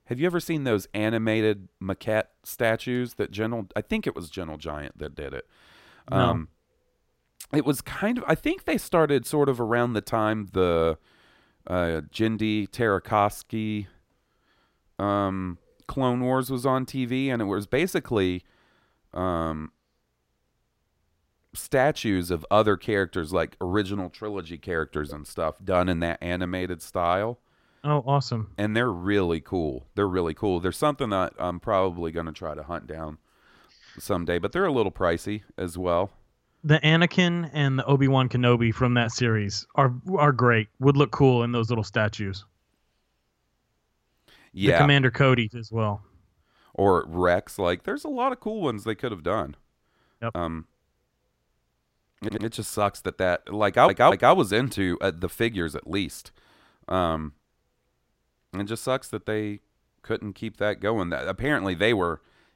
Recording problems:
audio stuttering; at 52 s and at 54 s

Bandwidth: 16 kHz